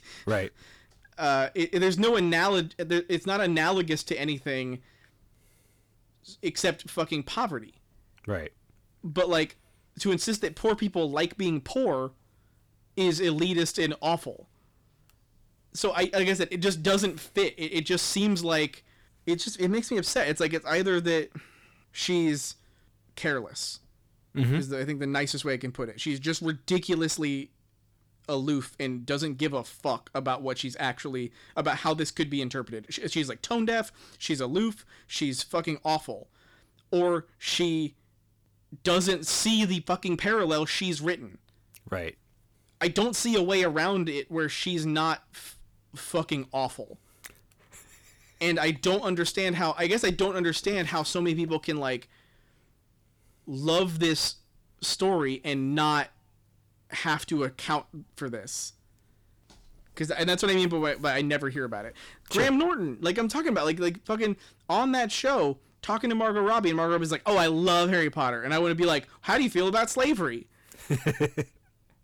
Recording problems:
distortion; slight; 10 dB below the speech

